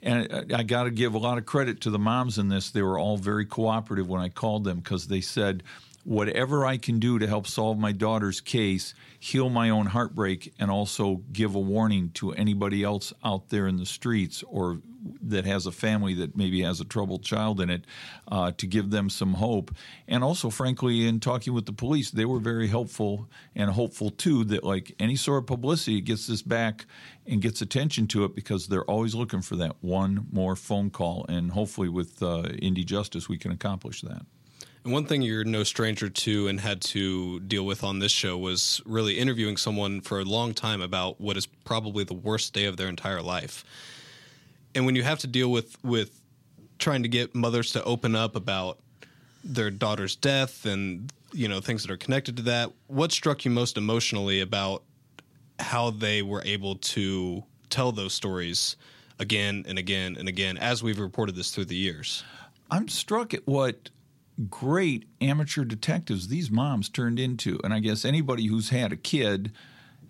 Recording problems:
none

